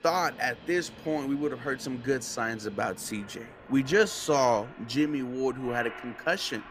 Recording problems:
train or aircraft noise; noticeable; throughout; 15 dB below the speech

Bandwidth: 15 kHz